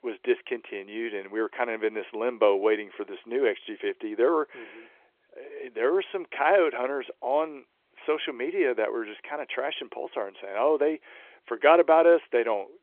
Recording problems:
phone-call audio; nothing above 3.5 kHz

